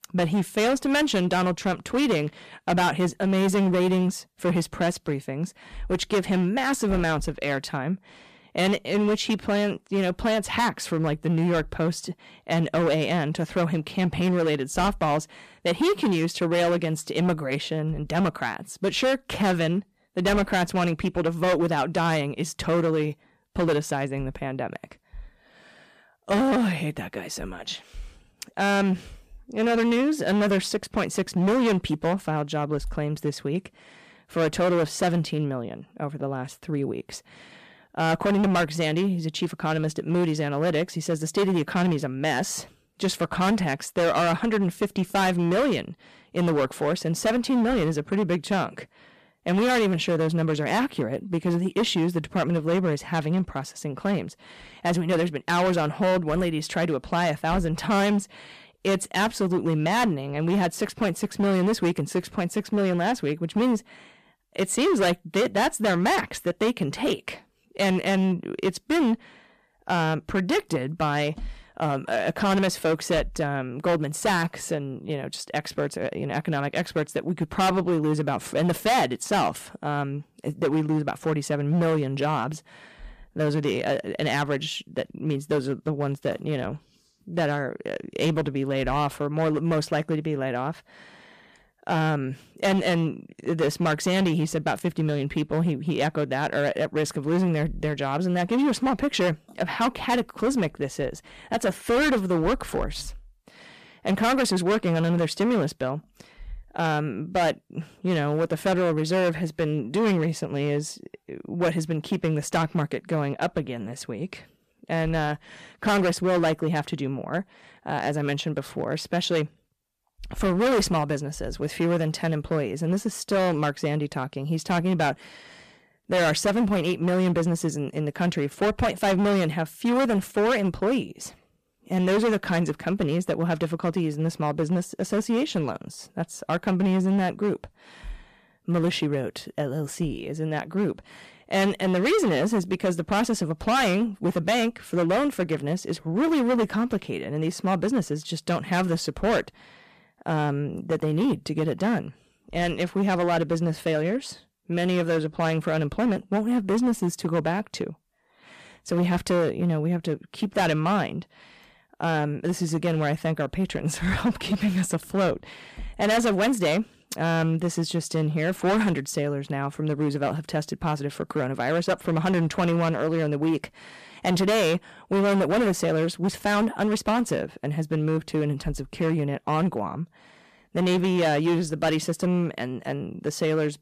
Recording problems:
distortion; heavy; 11% of the sound clipped

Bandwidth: 14.5 kHz